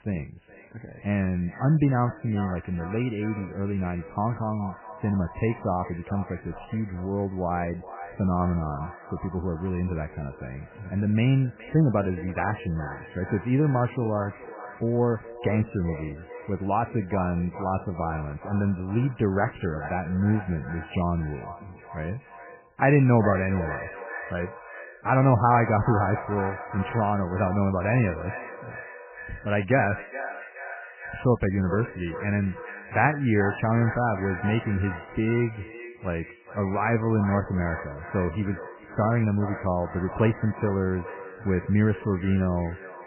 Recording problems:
garbled, watery; badly; nothing above 3 kHz
echo of what is said; noticeable; throughout; 420 ms later, 15 dB below the speech

